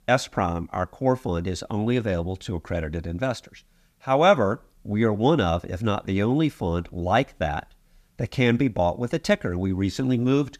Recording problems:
none

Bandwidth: 14.5 kHz